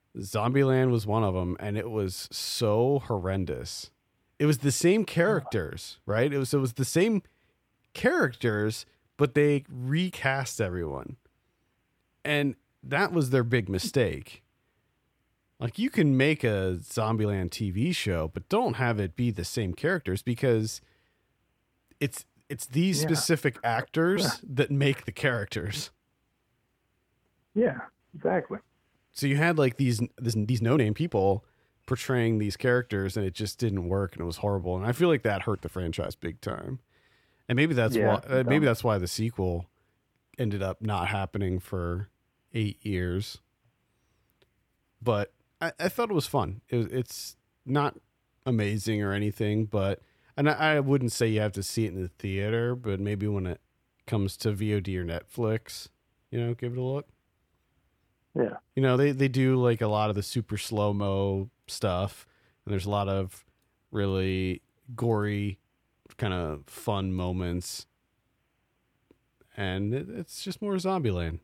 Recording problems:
uneven, jittery; strongly; from 7.5 s to 1:06

